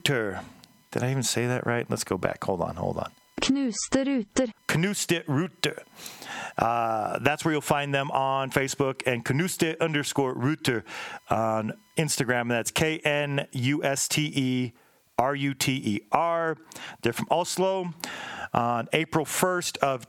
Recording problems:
squashed, flat; heavily

